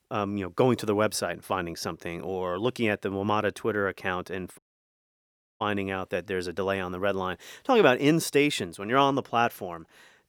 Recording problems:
audio cutting out; at 4.5 s for 1 s

